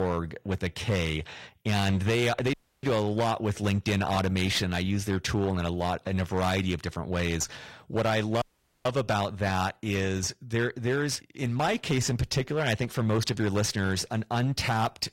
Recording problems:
distortion; slight; 10% of the sound clipped
garbled, watery; slightly; nothing above 16 kHz
abrupt cut into speech; at the start
audio cutting out; at 2.5 s and at 8.5 s

